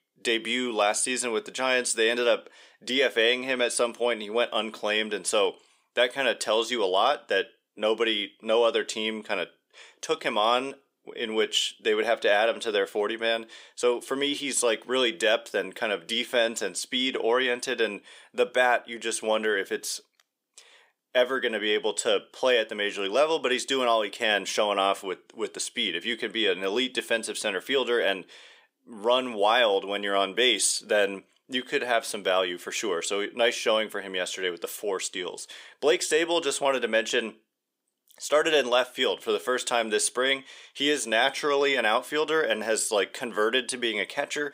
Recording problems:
thin; somewhat; fading below 350 Hz

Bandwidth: 15.5 kHz